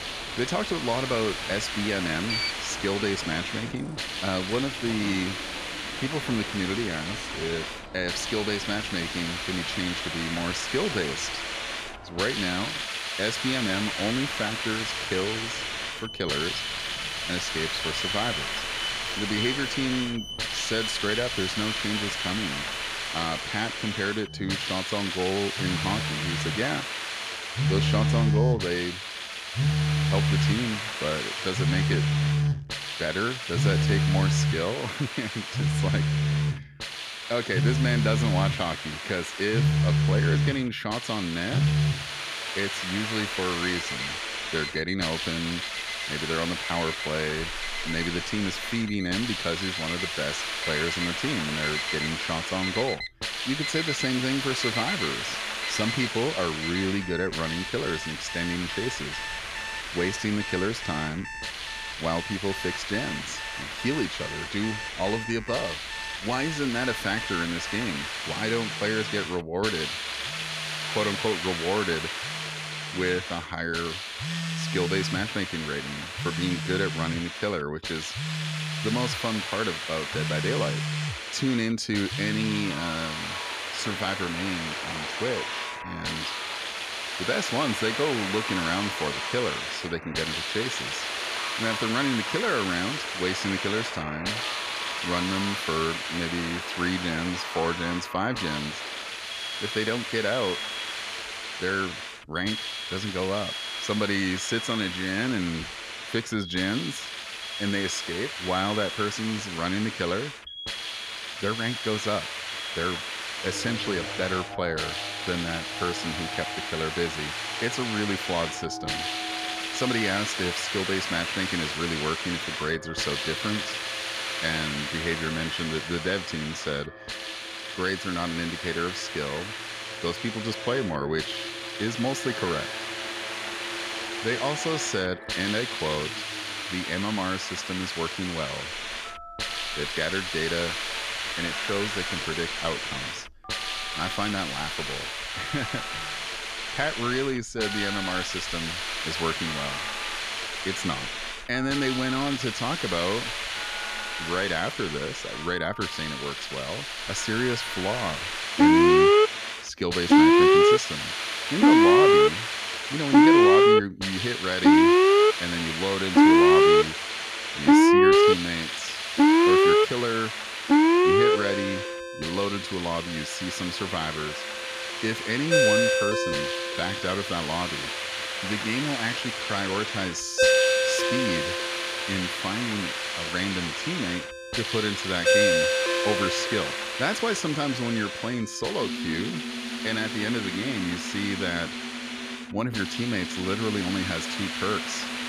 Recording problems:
alarms or sirens; very loud; throughout; 4 dB above the speech
hiss; loud; throughout; 1 dB below the speech

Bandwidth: 14.5 kHz